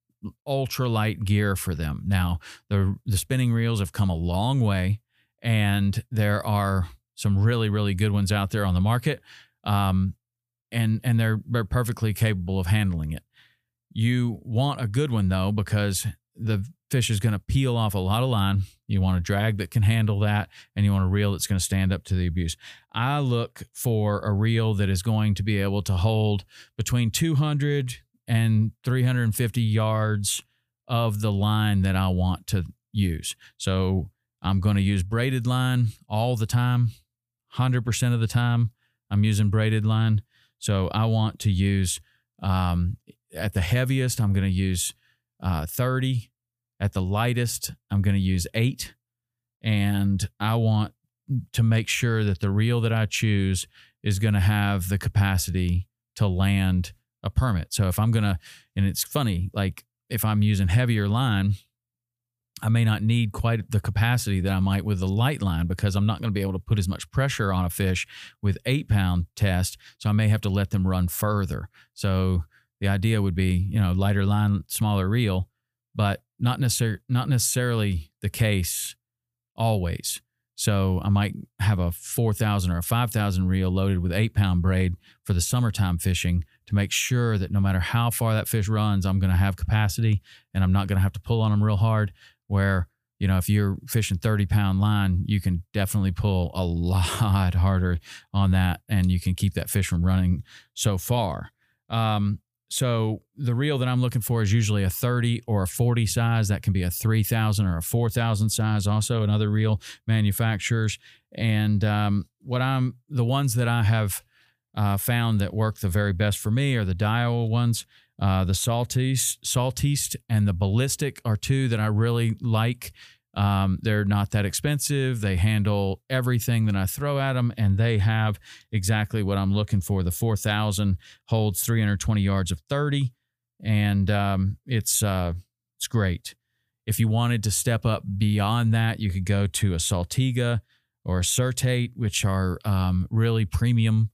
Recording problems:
none

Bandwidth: 15 kHz